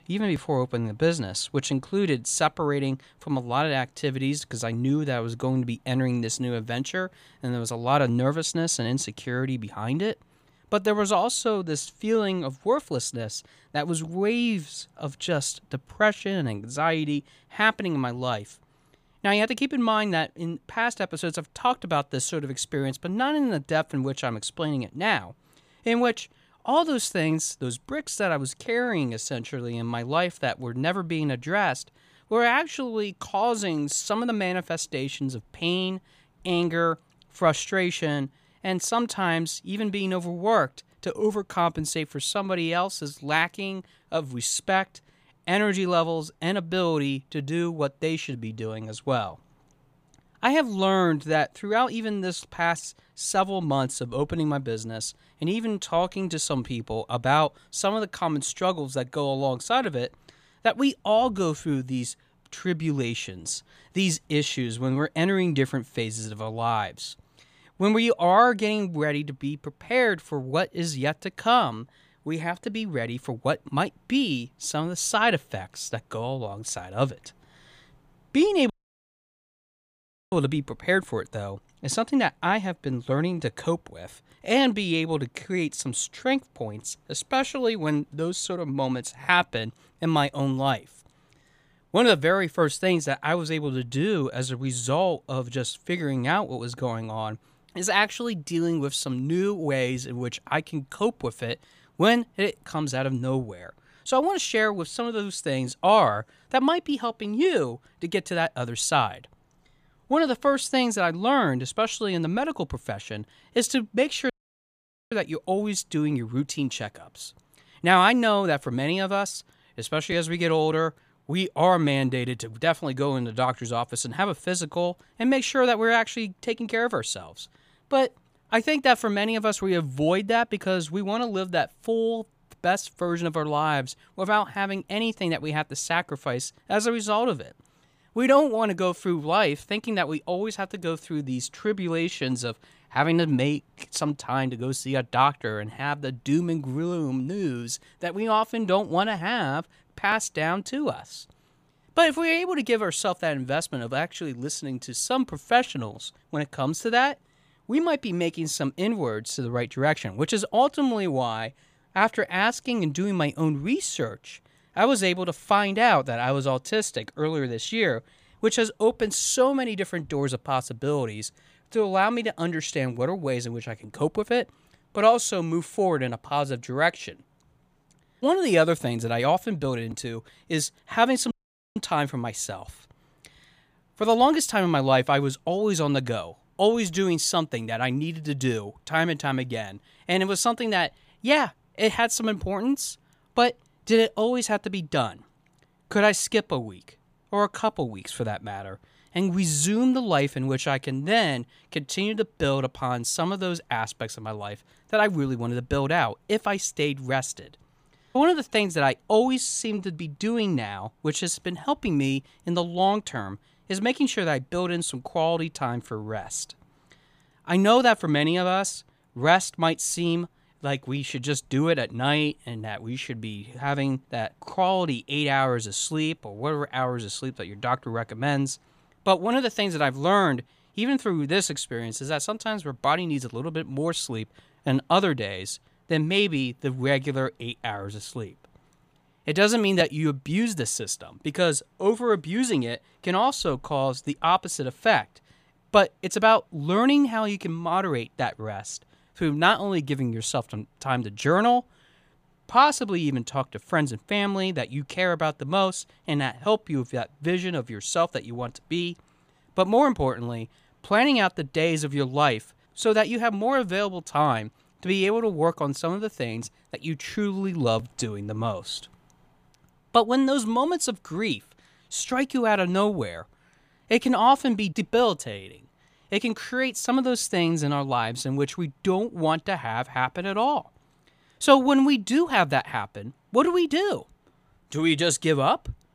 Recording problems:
audio cutting out; at 1:19 for 1.5 s, at 1:54 for 1 s and at 3:01

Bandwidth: 15 kHz